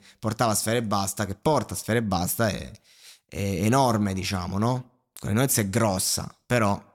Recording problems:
none

